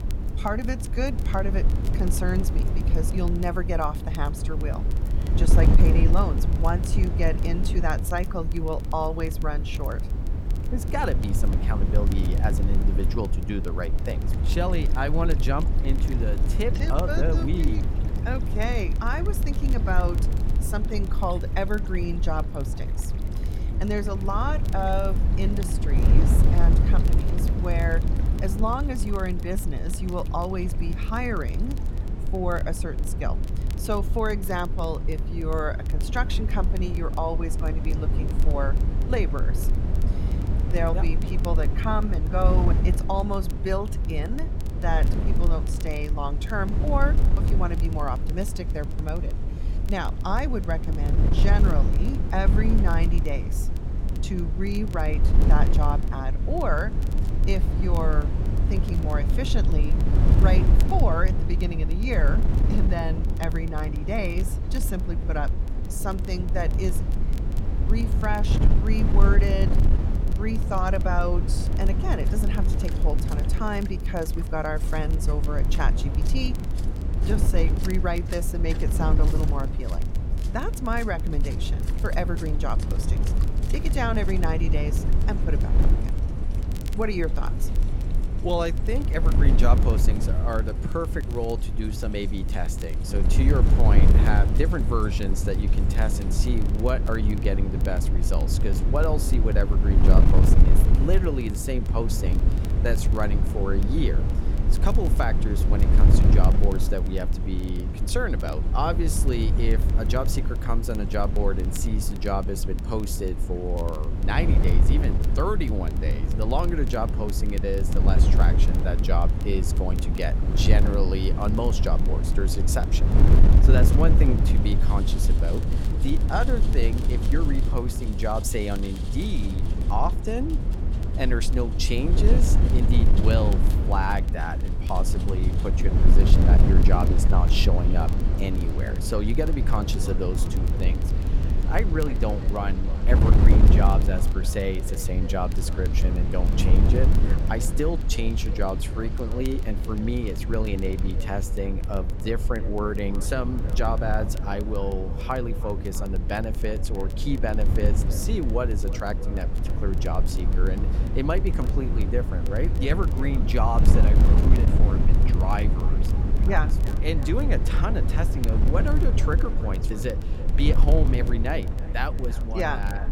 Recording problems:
echo of what is said; noticeable; from 2:18 on; 320 ms later, 15 dB below the speech
wind noise on the microphone; heavy; 7 dB below the speech
rain or running water; noticeable; throughout; 20 dB below the speech
crackle, like an old record; faint; 20 dB below the speech

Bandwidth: 16.5 kHz